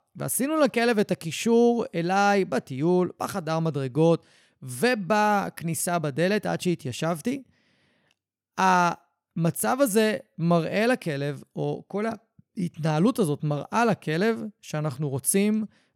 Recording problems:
none

